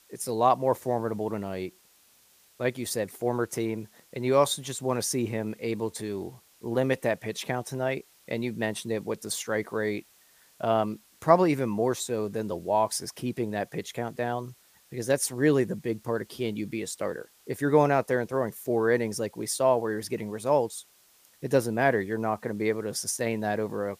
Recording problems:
hiss; faint; throughout; 30 dB below the speech

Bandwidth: 15 kHz